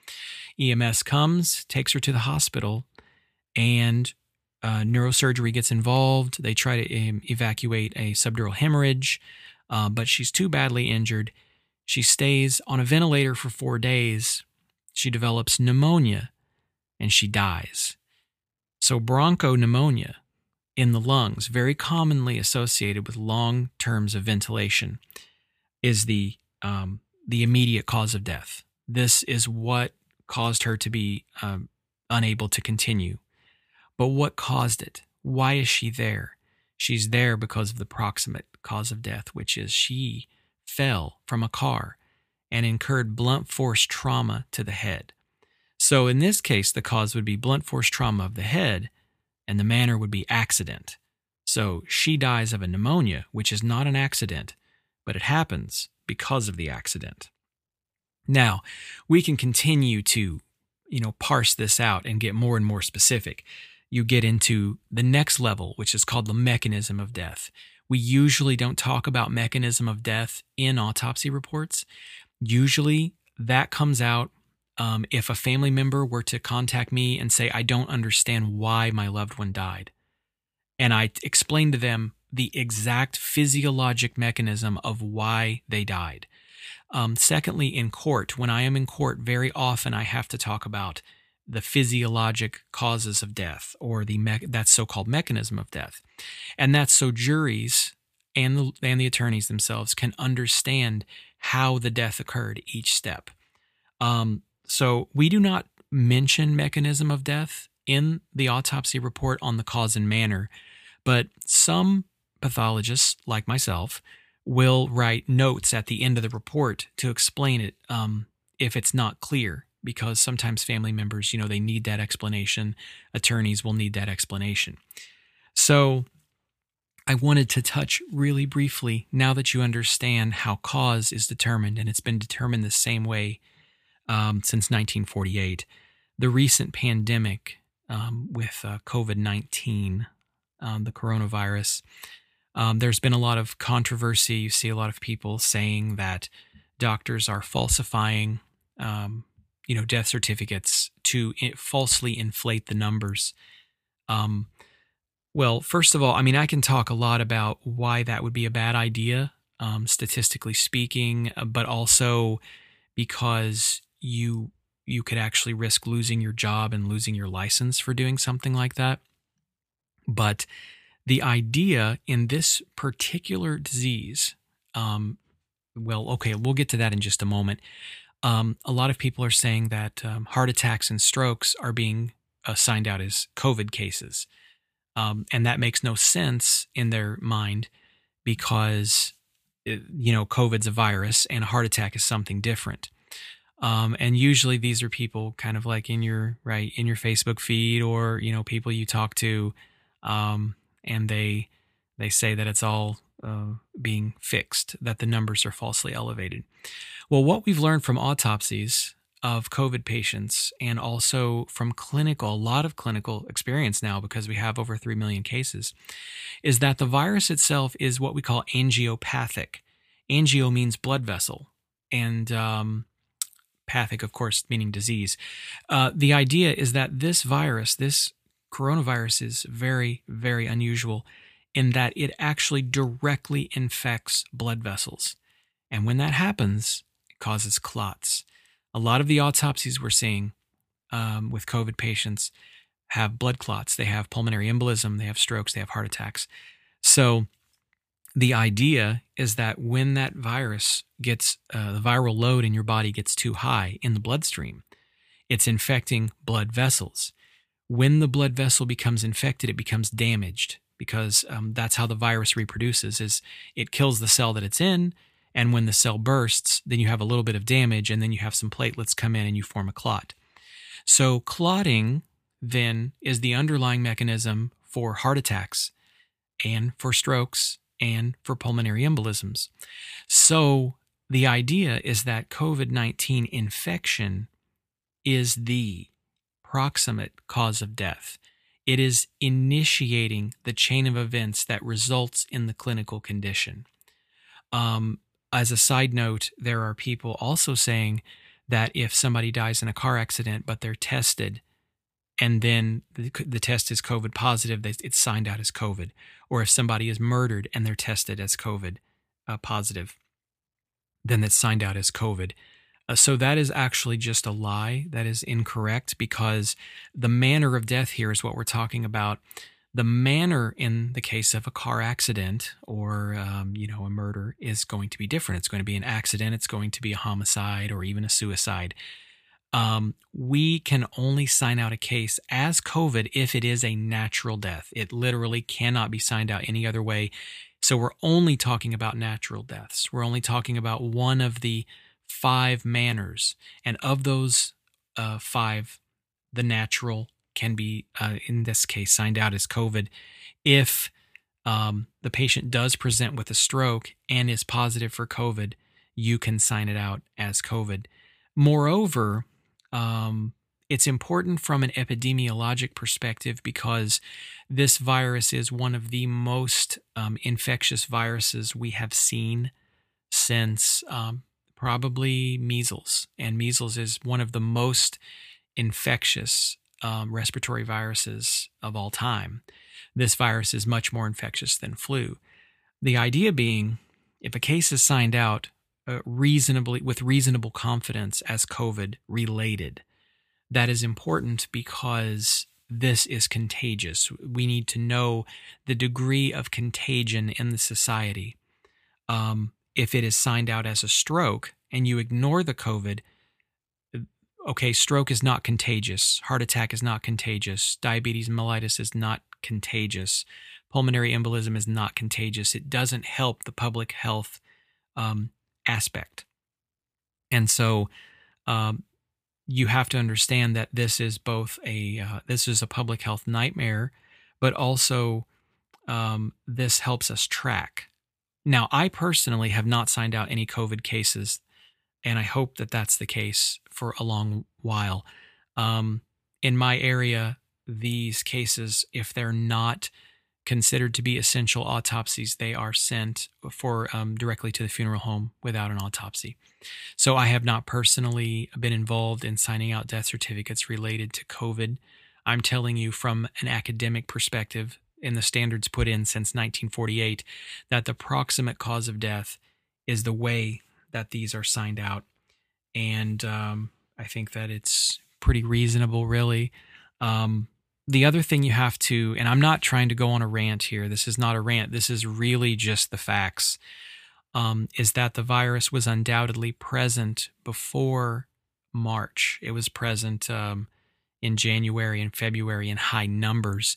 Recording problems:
none

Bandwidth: 15 kHz